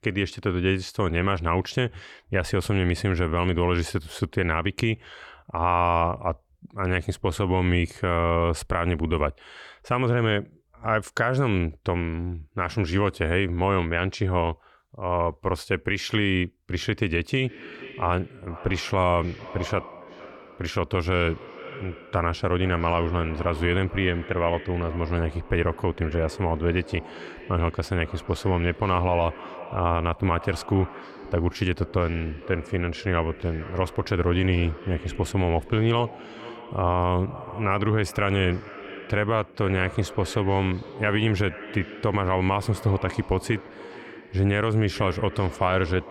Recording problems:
echo of what is said; noticeable; from 17 s on; 450 ms later, 15 dB below the speech

